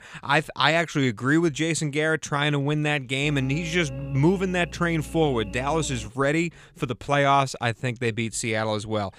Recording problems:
electrical hum; noticeable; from 3 to 6 s; 60 Hz, 20 dB below the speech

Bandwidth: 15 kHz